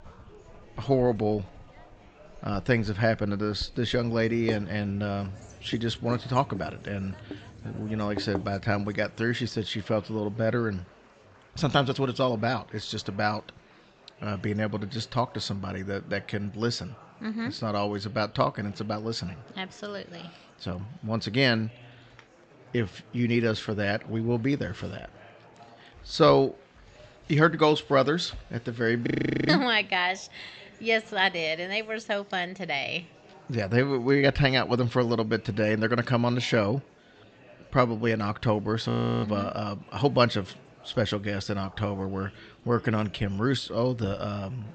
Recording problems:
high frequencies cut off; noticeable; nothing above 8 kHz
household noises; noticeable; until 9 s; 15 dB below the speech
murmuring crowd; faint; throughout; 25 dB below the speech
audio freezing; at 29 s and at 39 s

